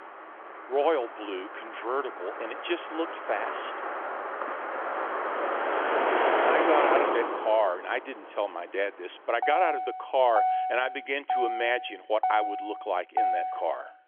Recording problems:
phone-call audio; nothing above 3.5 kHz
traffic noise; very loud; throughout; 1 dB above the speech

